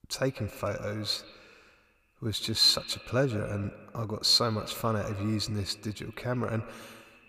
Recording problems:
echo of what is said; noticeable; throughout; 150 ms later, 20 dB below the speech

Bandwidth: 15 kHz